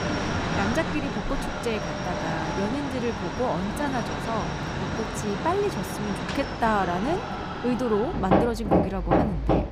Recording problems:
machinery noise; very loud; throughout; 1 dB above the speech

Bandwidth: 15.5 kHz